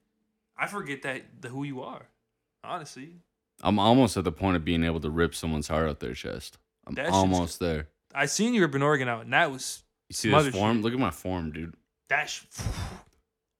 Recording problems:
none

